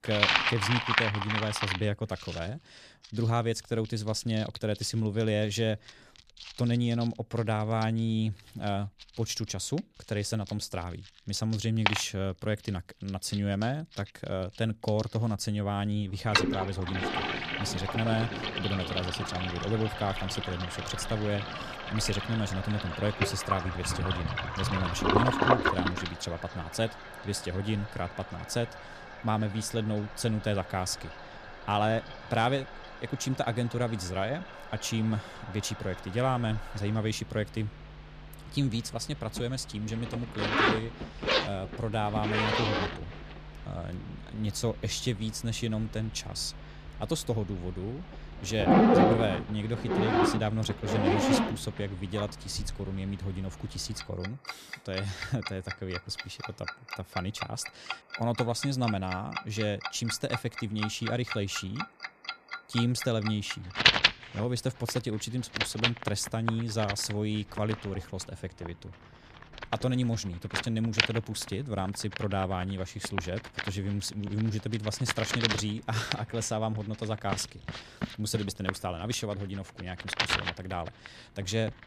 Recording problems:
household noises; very loud; throughout; 1 dB above the speech

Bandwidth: 14.5 kHz